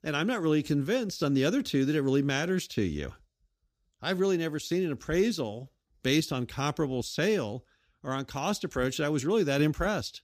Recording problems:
none

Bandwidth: 15 kHz